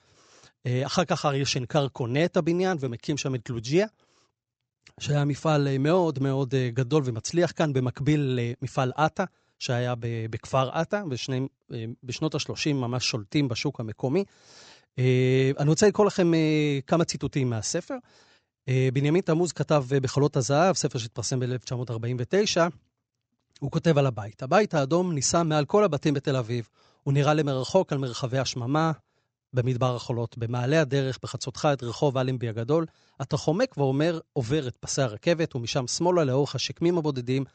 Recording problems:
high frequencies cut off; noticeable; nothing above 8 kHz

